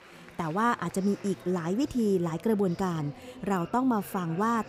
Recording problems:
murmuring crowd; noticeable; throughout; 20 dB below the speech

